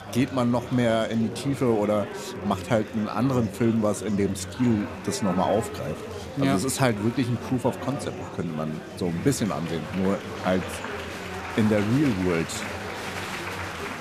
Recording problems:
murmuring crowd; loud; throughout; 9 dB below the speech

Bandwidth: 14.5 kHz